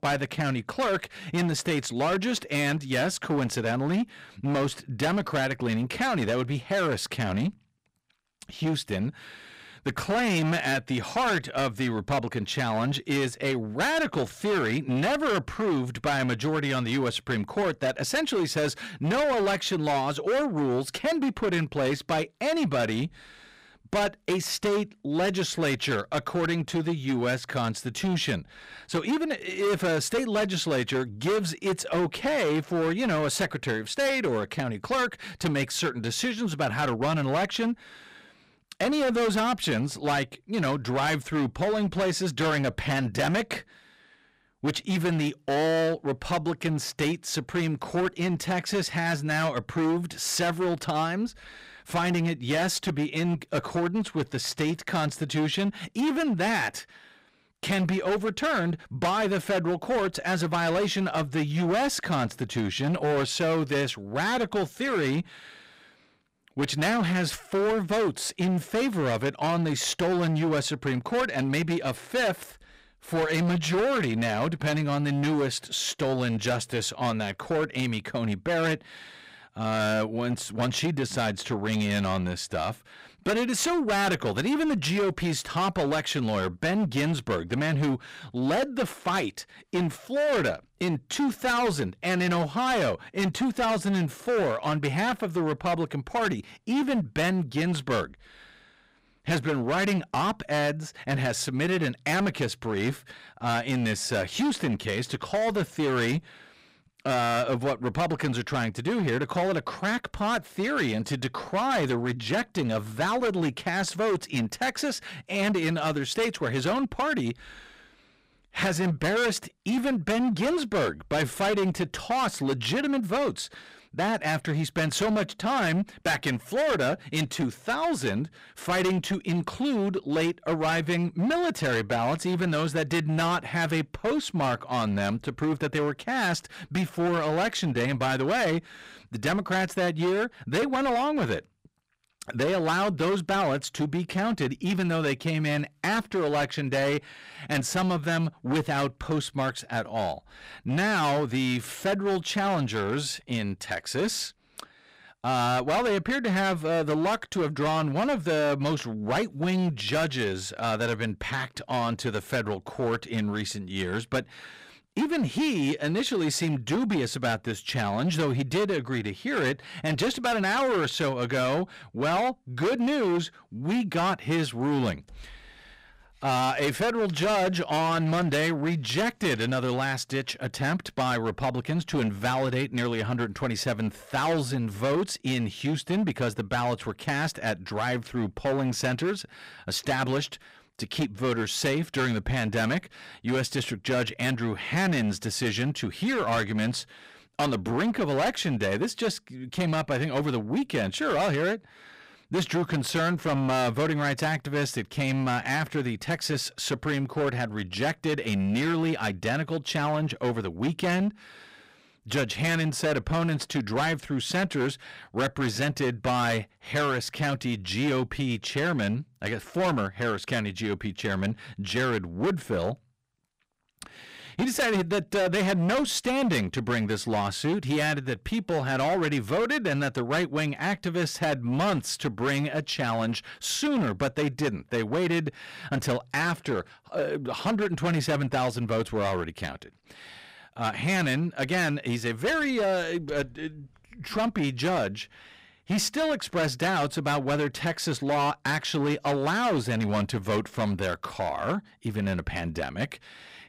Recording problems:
distortion; heavy; 17% of the sound clipped

